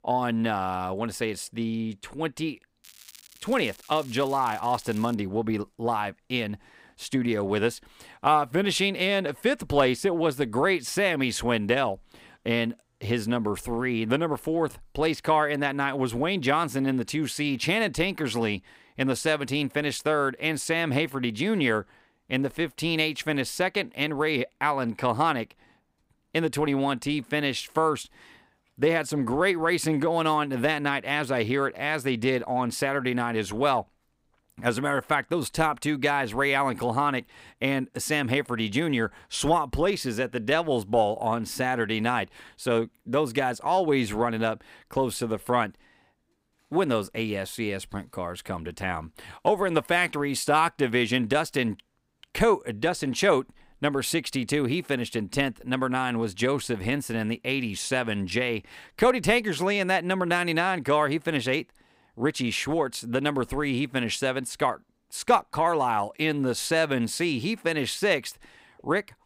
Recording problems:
crackling; faint; from 3 to 5 s; 20 dB below the speech

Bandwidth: 15.5 kHz